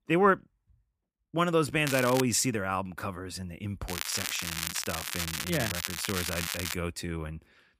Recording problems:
crackling; loud; at 2 s and from 4 to 6.5 s; 3 dB below the speech

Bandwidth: 15 kHz